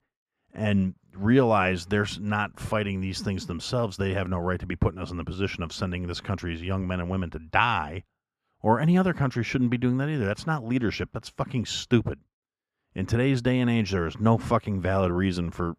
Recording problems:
muffled; slightly; fading above 4 kHz

